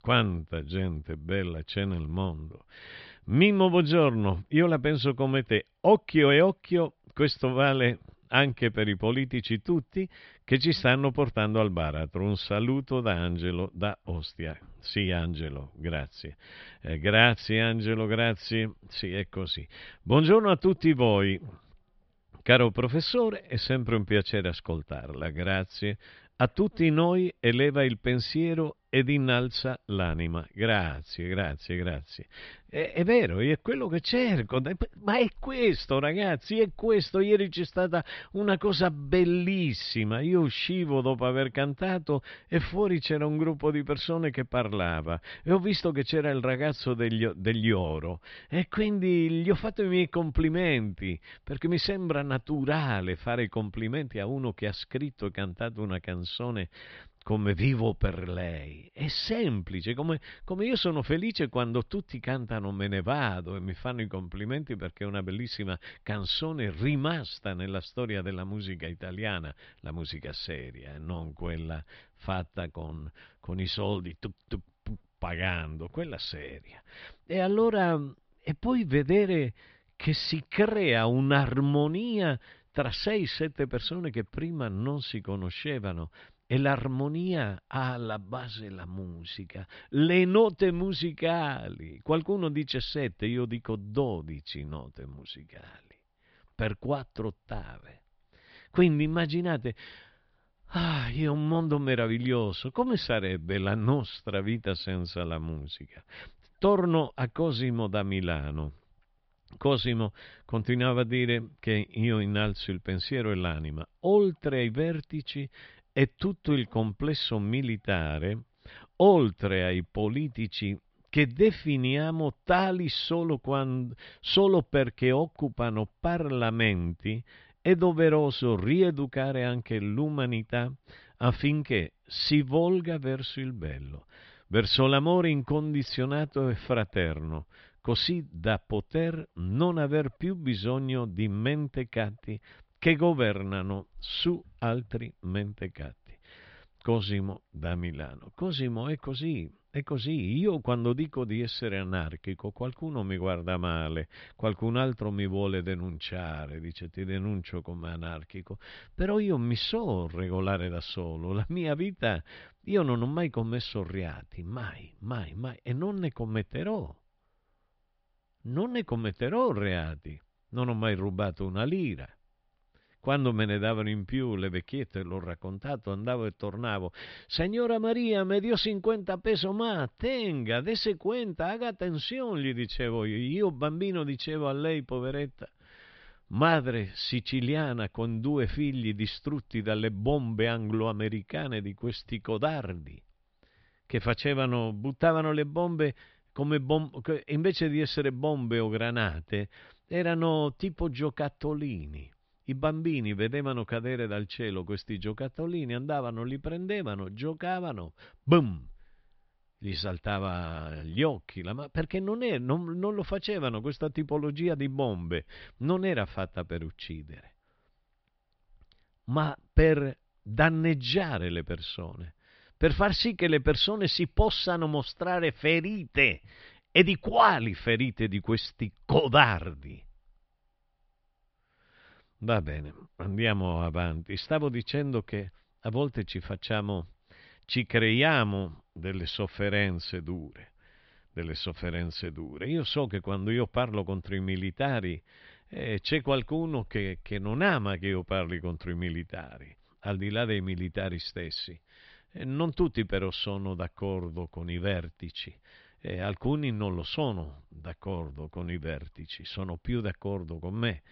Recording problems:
high frequencies cut off; noticeable; nothing above 5.5 kHz

